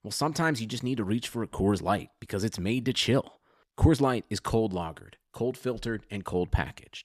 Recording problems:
none

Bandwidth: 14.5 kHz